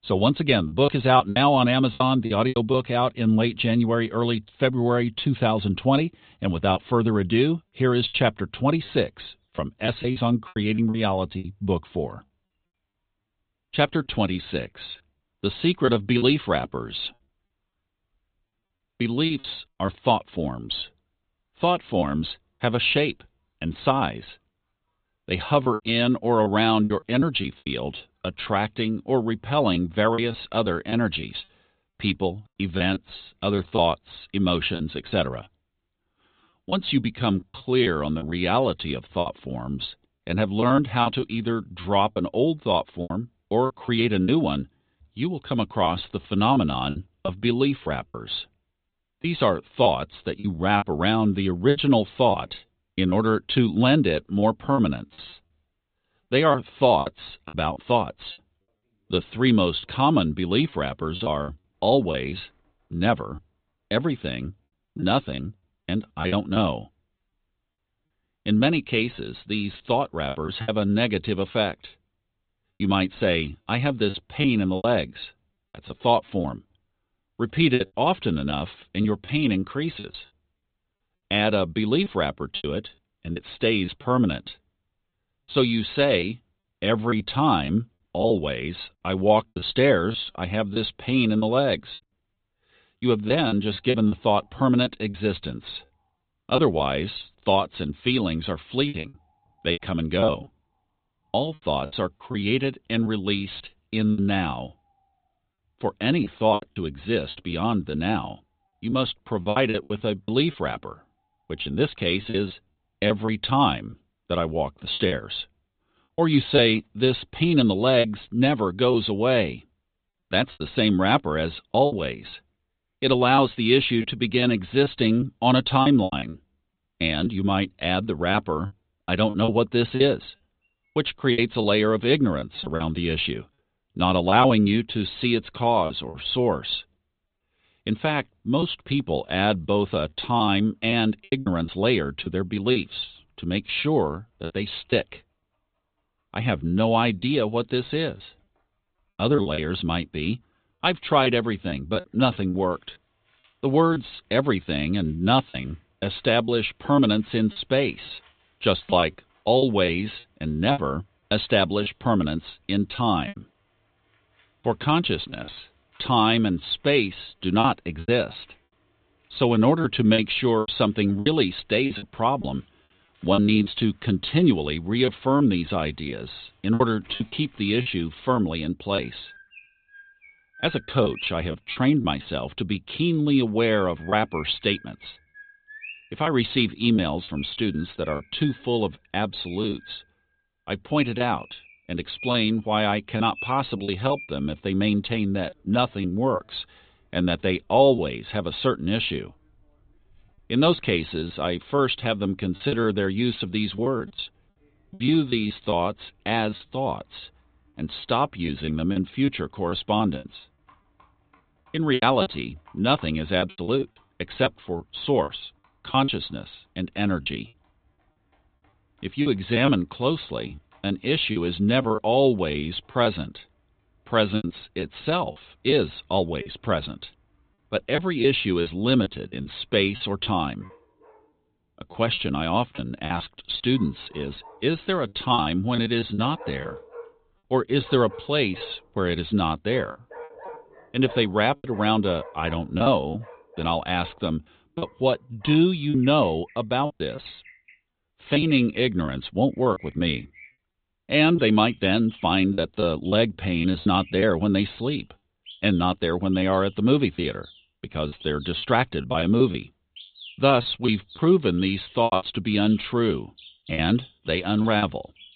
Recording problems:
high frequencies cut off; severe; nothing above 4 kHz
animal sounds; faint; throughout; 25 dB below the speech
choppy; very; 7% of the speech affected

